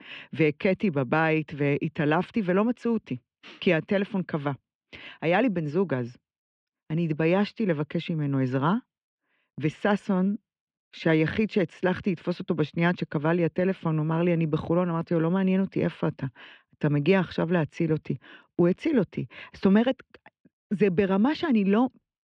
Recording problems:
muffled; very; fading above 3 kHz

